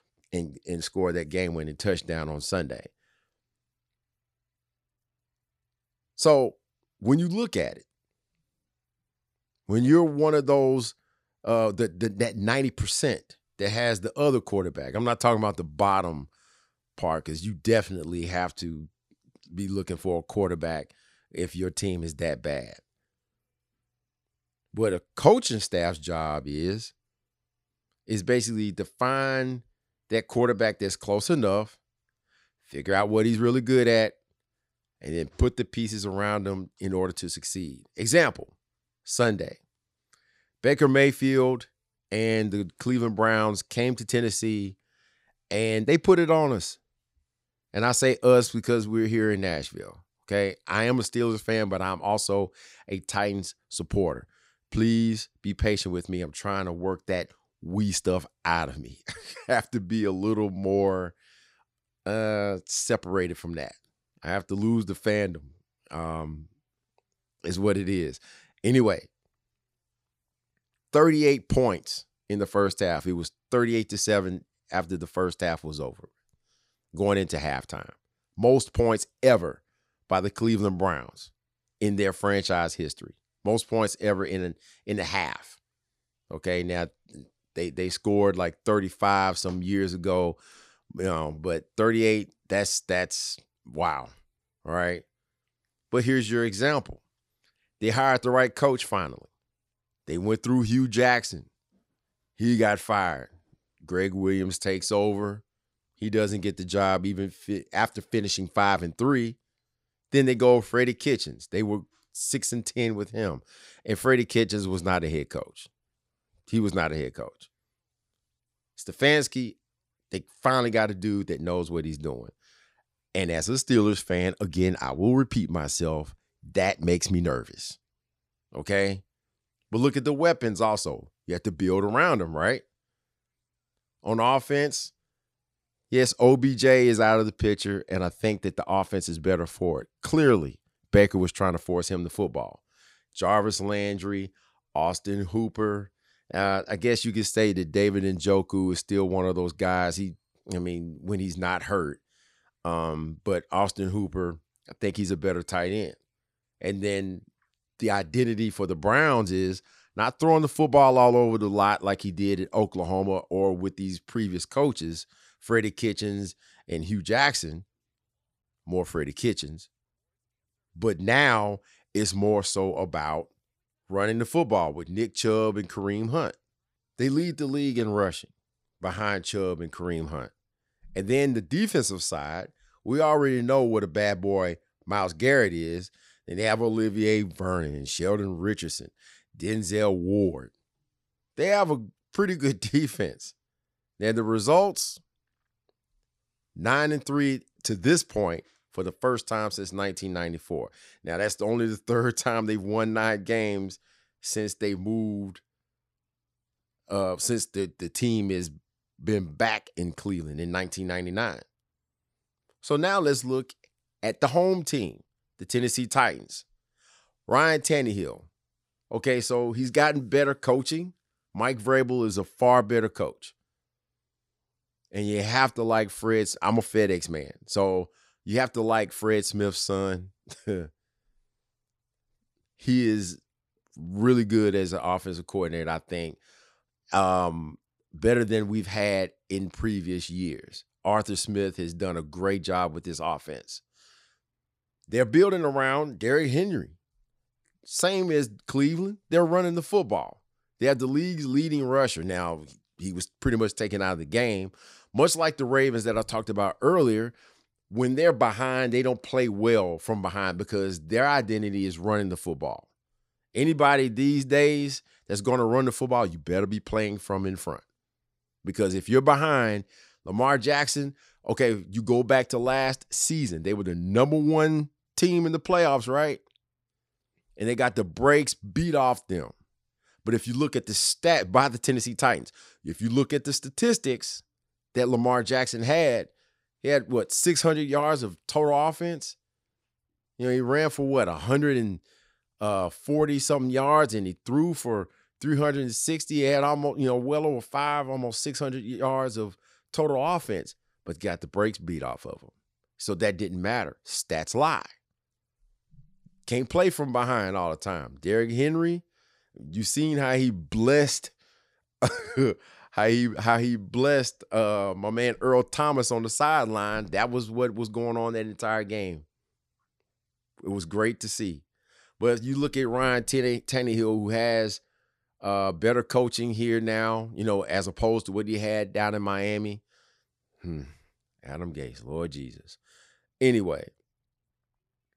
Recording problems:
none

